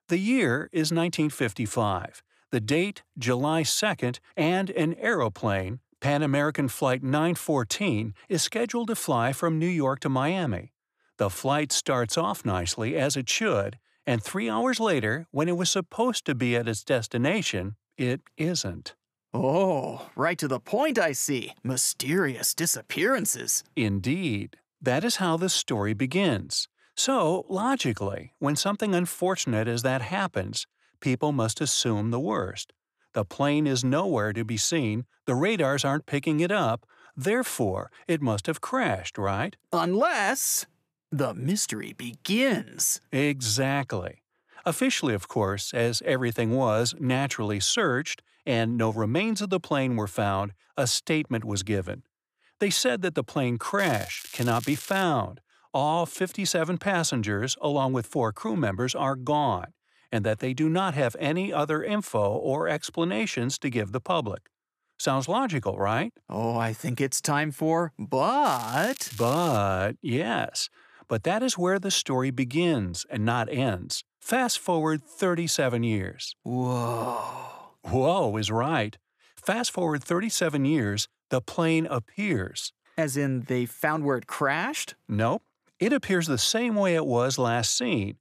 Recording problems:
crackling; noticeable; from 54 to 55 s and from 1:08 to 1:10; 15 dB below the speech

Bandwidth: 14.5 kHz